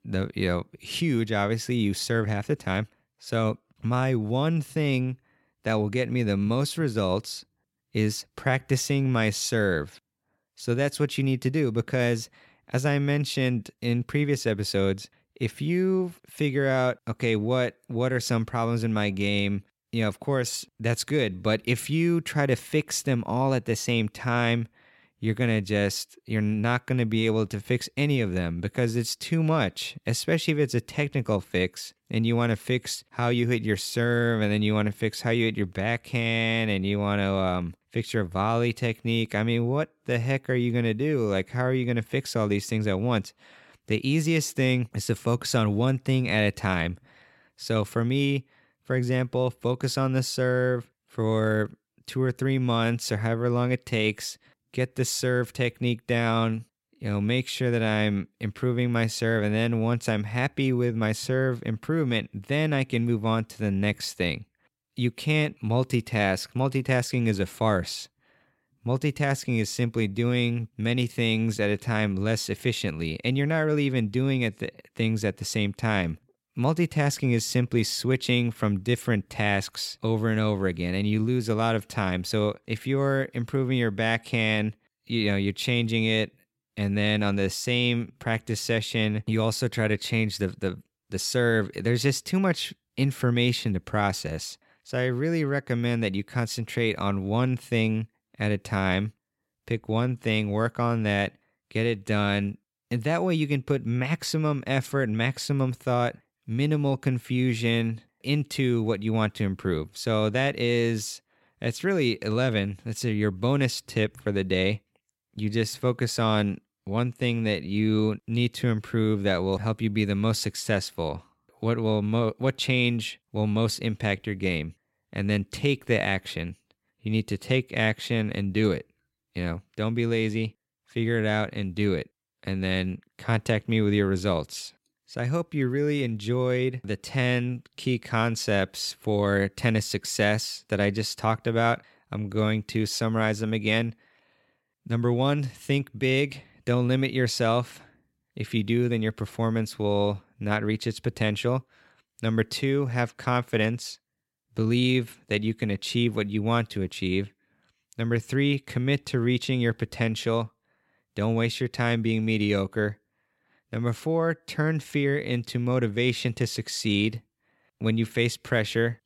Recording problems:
none

